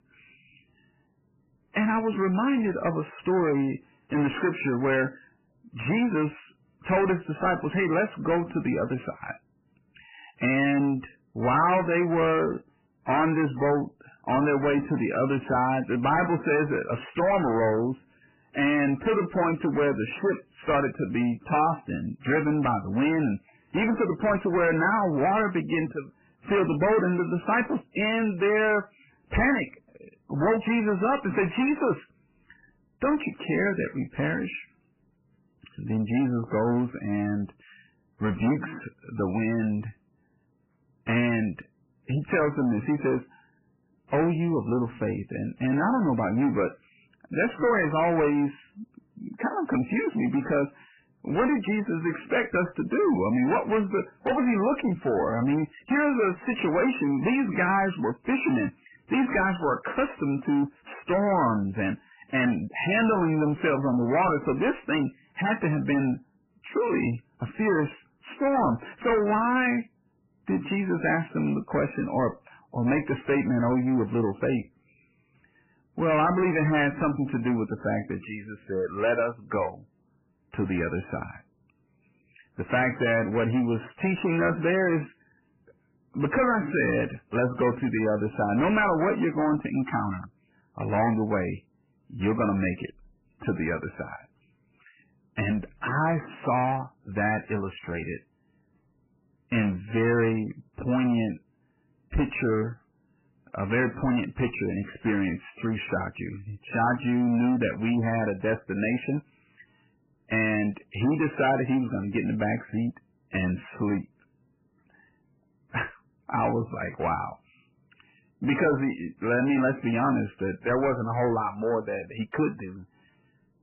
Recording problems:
distortion; heavy; 6 dB below the speech
garbled, watery; badly; nothing above 3 kHz

